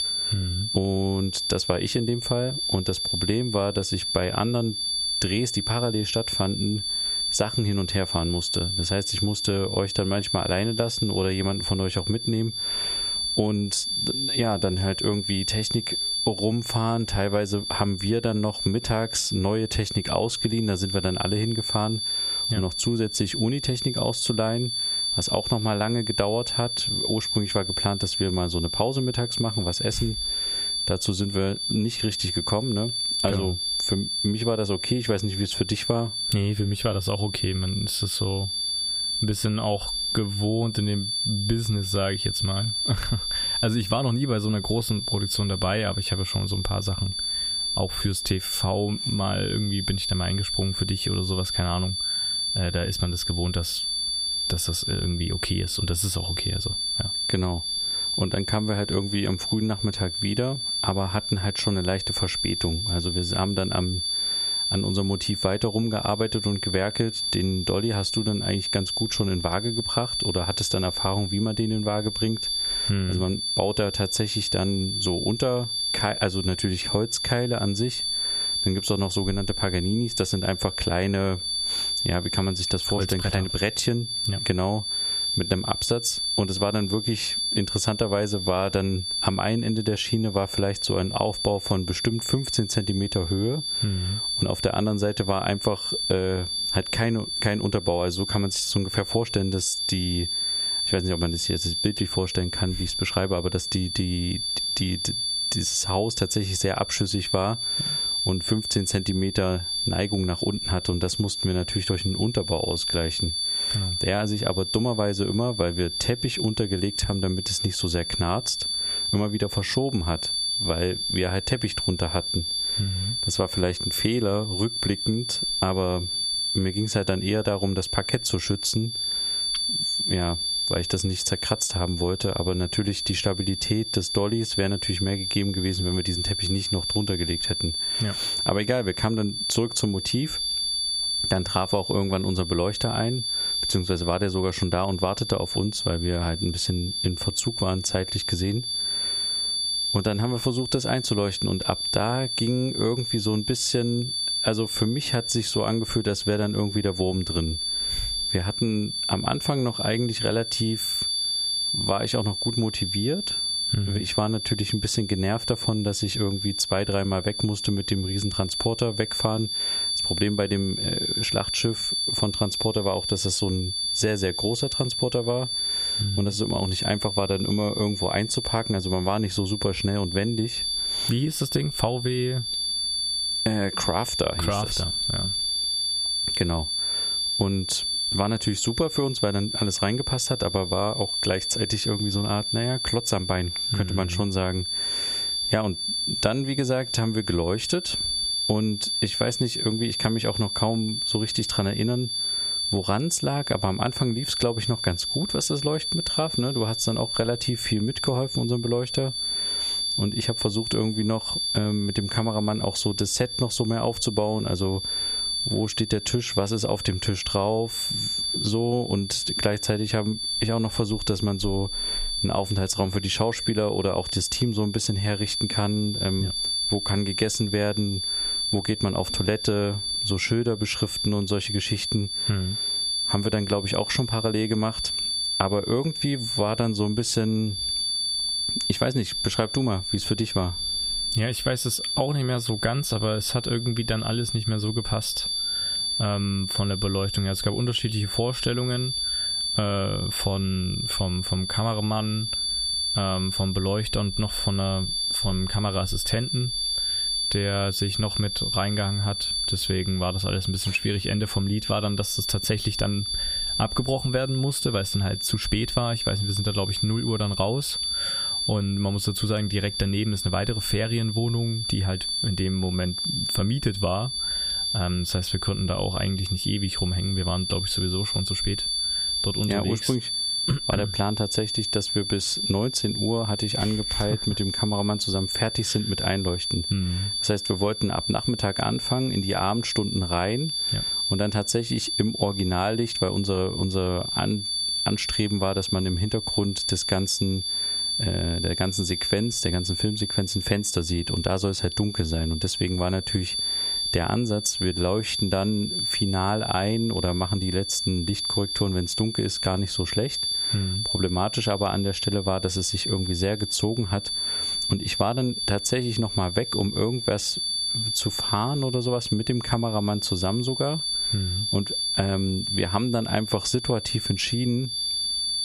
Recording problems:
squashed, flat; somewhat
high-pitched whine; loud; throughout; 4.5 kHz, 1 dB below the speech

